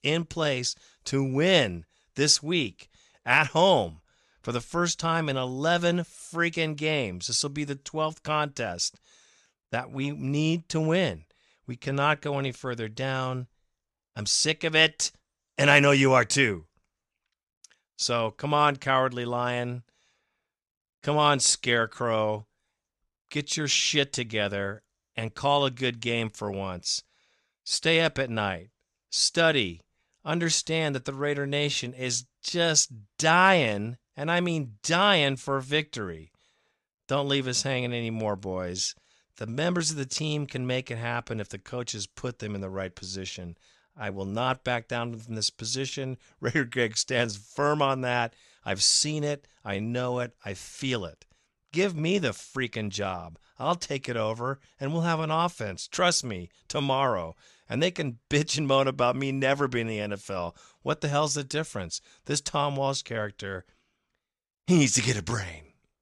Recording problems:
none

